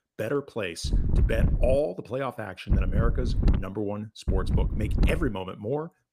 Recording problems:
wind noise on the microphone; heavy; at 1 s, at 2.5 s and from 4.5 to 5.5 s; 8 dB below the speech

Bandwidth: 15 kHz